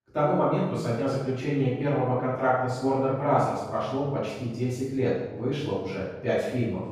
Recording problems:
room echo; strong; dies away in 1.1 s
off-mic speech; far

